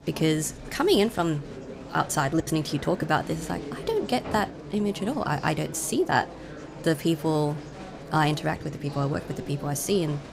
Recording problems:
murmuring crowd; noticeable; throughout; 15 dB below the speech

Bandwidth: 15.5 kHz